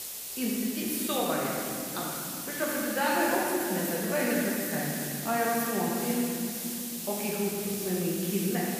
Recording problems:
room echo; strong; dies away in 3 s
off-mic speech; far
hiss; loud; throughout; 4 dB below the speech

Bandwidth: 15 kHz